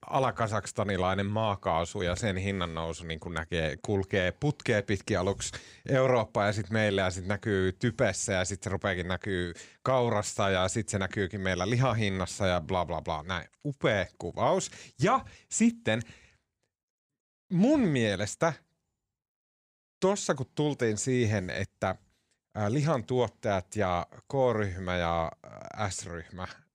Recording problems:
none

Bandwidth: 15.5 kHz